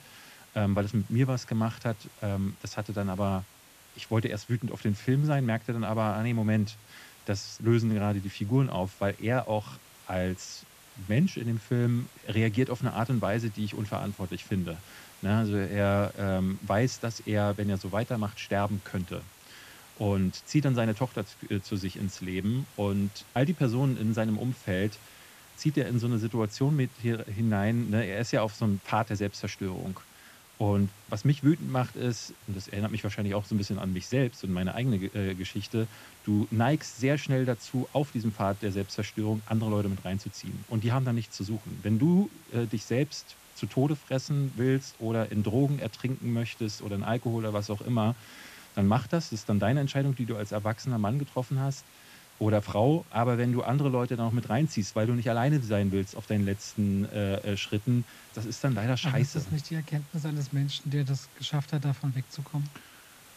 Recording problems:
high frequencies cut off; noticeable; nothing above 8 kHz
hiss; faint; throughout; 20 dB below the speech

